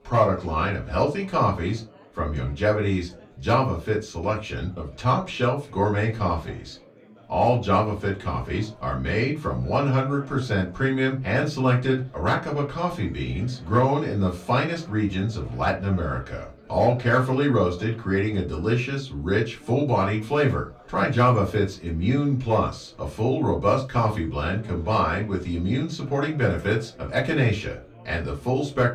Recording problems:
off-mic speech; far
room echo; very slight; dies away in 0.2 s
background chatter; faint; throughout; 4 voices, 25 dB below the speech

